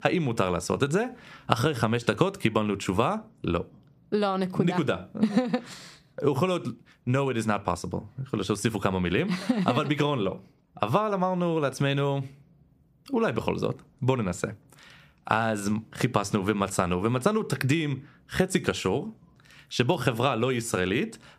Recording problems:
squashed, flat; somewhat

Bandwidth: 15 kHz